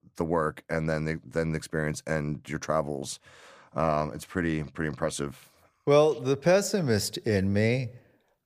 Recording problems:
none

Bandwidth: 15 kHz